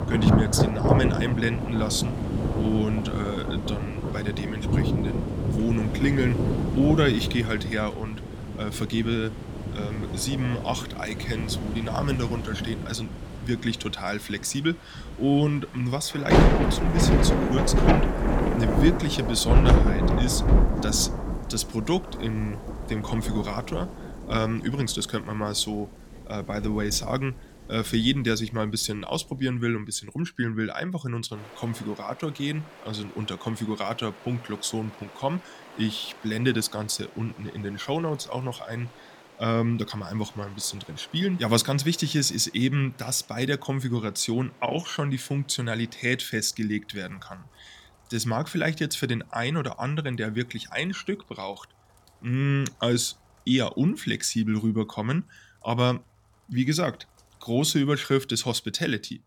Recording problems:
rain or running water; very loud; throughout; 1 dB above the speech

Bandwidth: 17.5 kHz